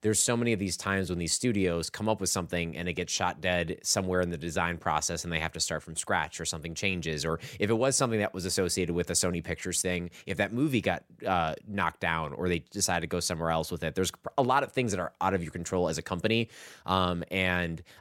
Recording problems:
none

